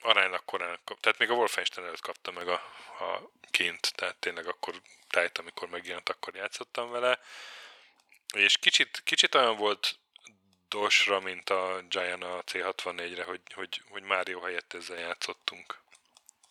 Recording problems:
thin; very; fading below 700 Hz

